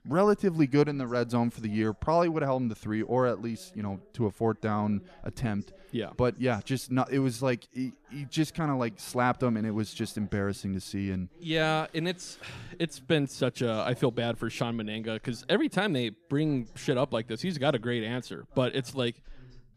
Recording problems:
background chatter; faint; throughout; 2 voices, 25 dB below the speech

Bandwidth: 14.5 kHz